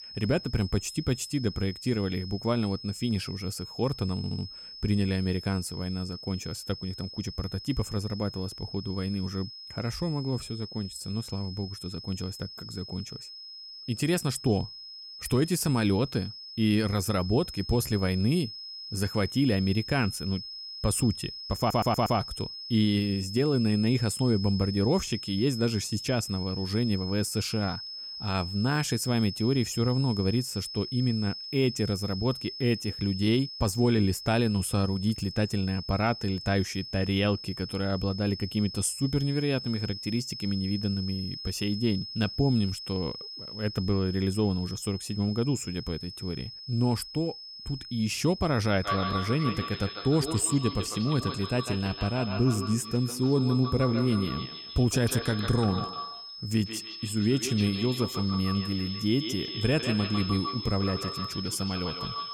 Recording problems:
echo of what is said; strong; from 49 s on; 150 ms later, 9 dB below the speech
high-pitched whine; loud; throughout; 5 kHz, 10 dB below the speech
audio stuttering; at 4 s and at 22 s

